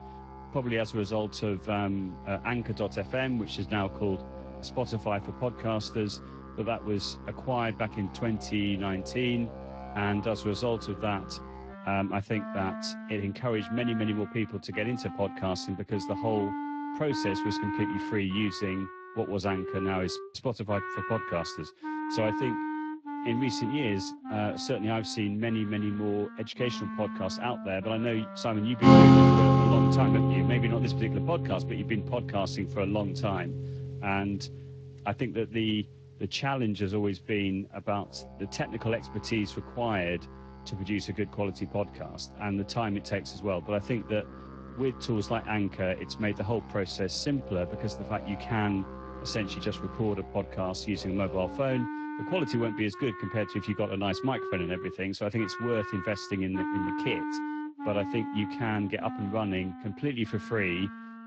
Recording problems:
garbled, watery; slightly; nothing above 7.5 kHz
background music; very loud; throughout; 1 dB above the speech

